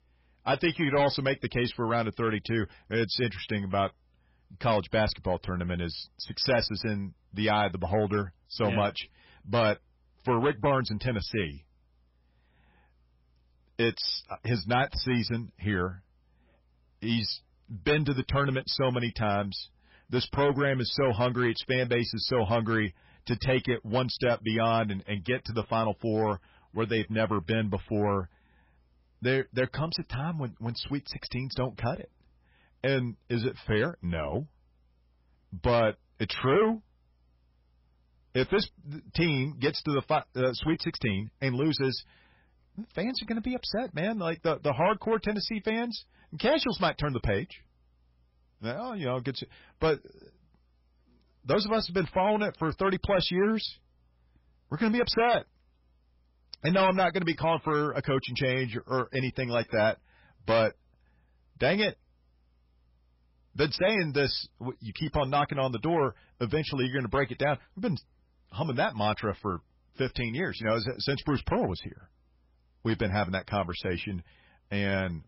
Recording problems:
garbled, watery; badly; nothing above 5.5 kHz
distortion; slight; 4% of the sound clipped

